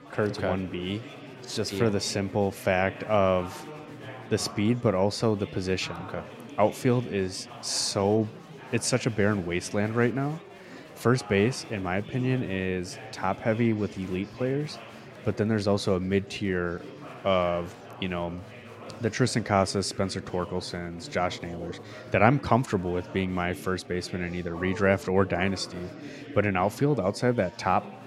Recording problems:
chatter from many people; noticeable; throughout; 15 dB below the speech

